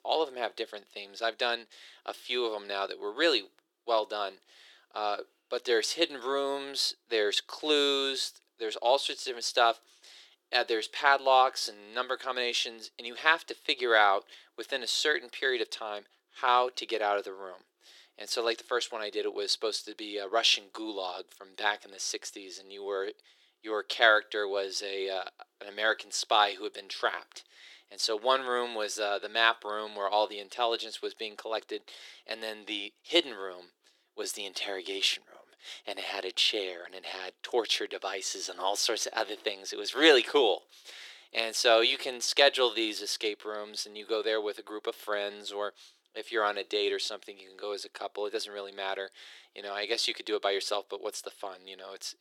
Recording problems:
thin; very; fading below 350 Hz

